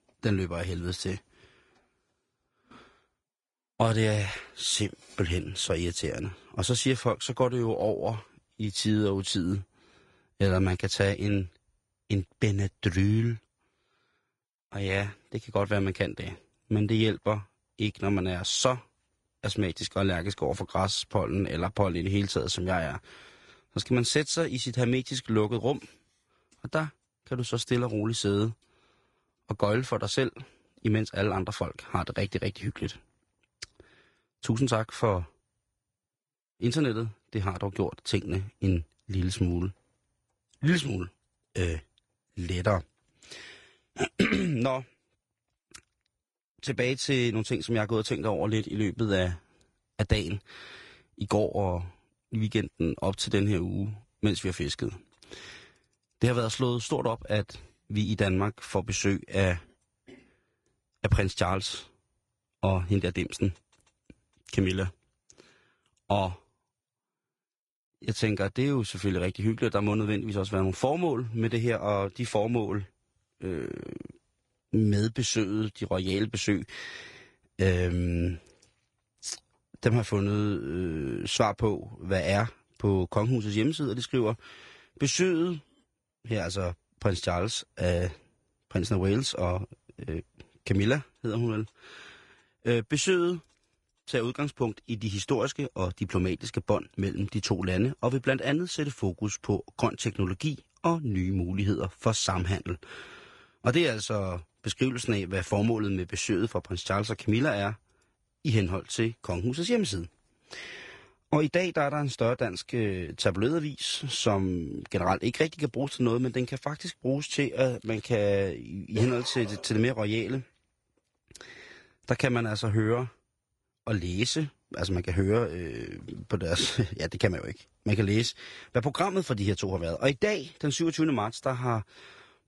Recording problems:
garbled, watery; slightly; nothing above 10 kHz

